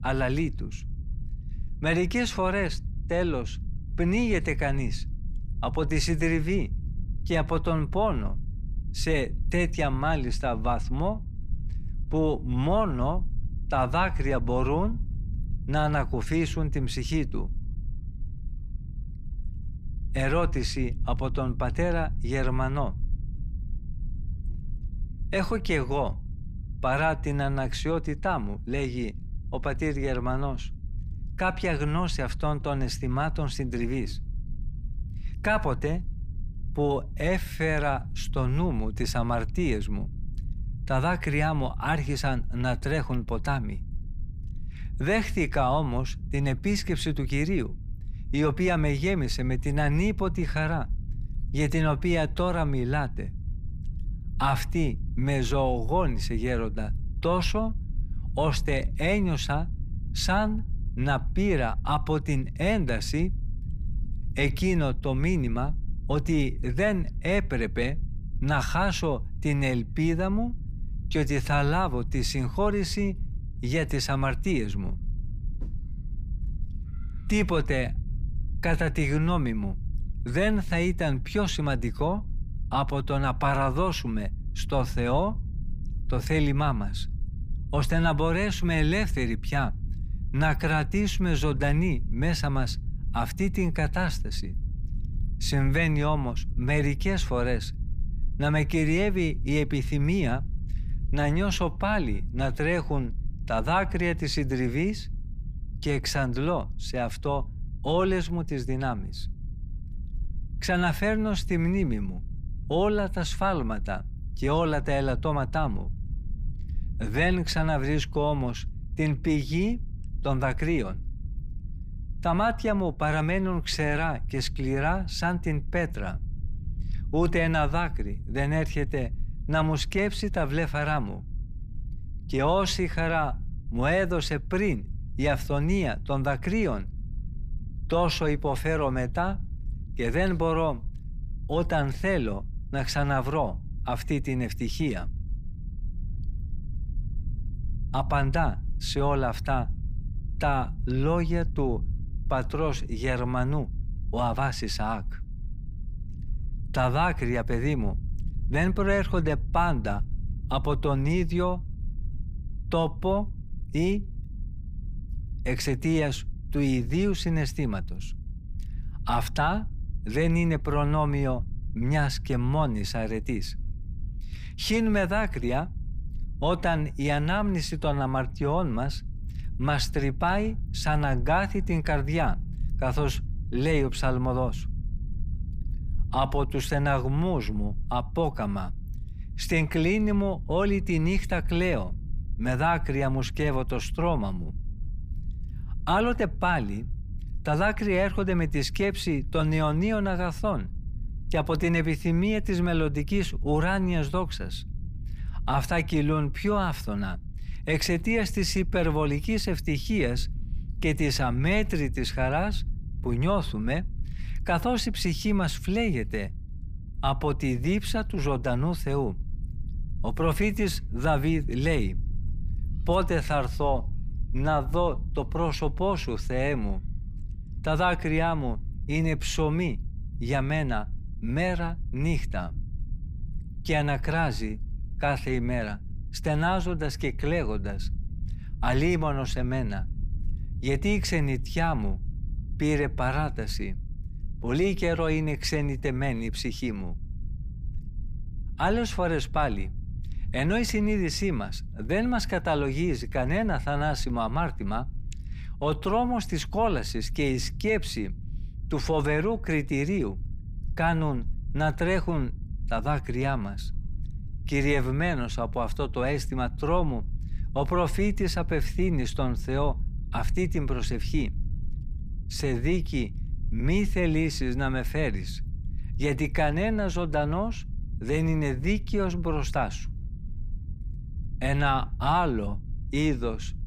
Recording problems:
low rumble; faint; throughout; 25 dB below the speech

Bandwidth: 15 kHz